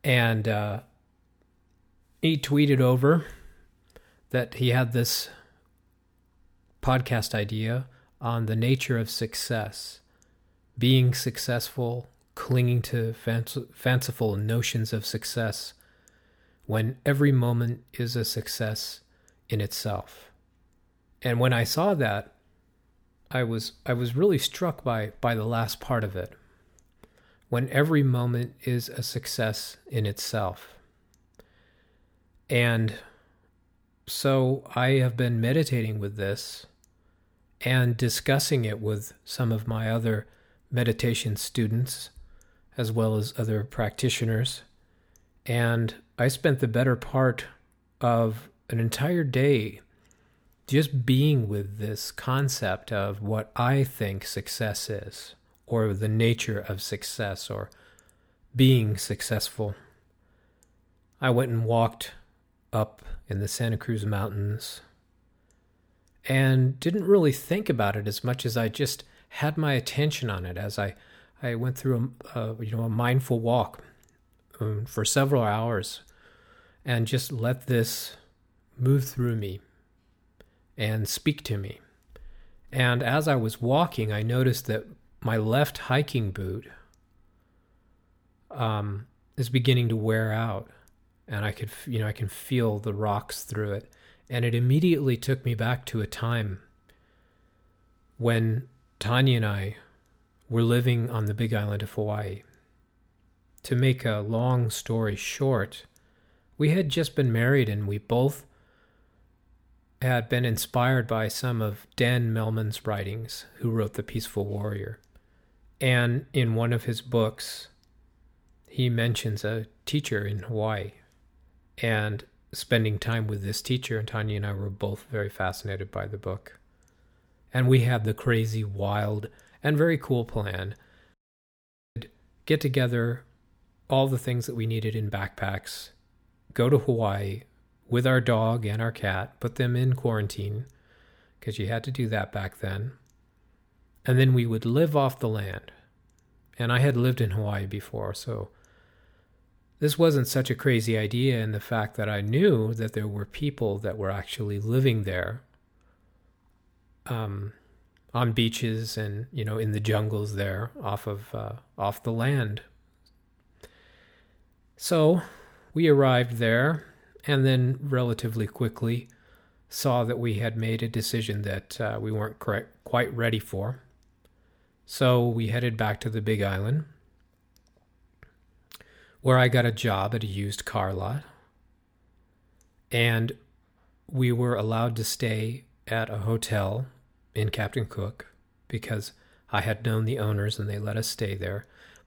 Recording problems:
audio cutting out; at 2:11 for 1 s

